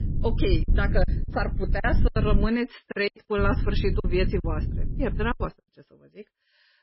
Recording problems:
garbled, watery; badly; nothing above 5 kHz
low rumble; noticeable; until 2.5 s and from 3.5 to 5.5 s; 15 dB below the speech
choppy; very; 10% of the speech affected

